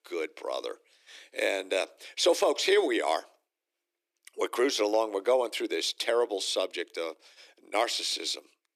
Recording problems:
thin; very; fading below 300 Hz

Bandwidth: 14.5 kHz